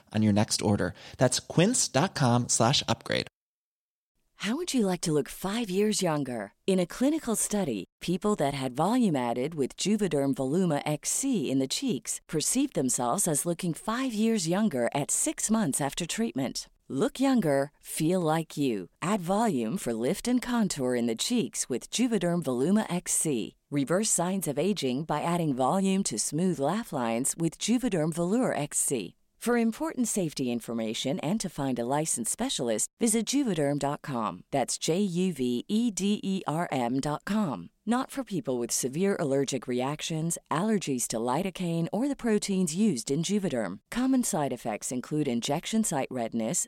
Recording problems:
none

